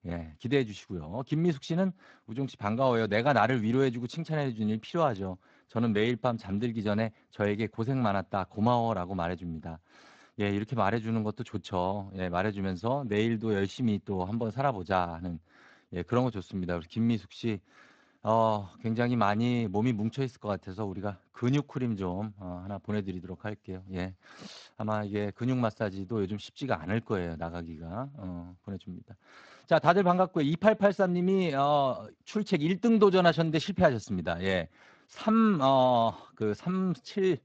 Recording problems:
garbled, watery; slightly

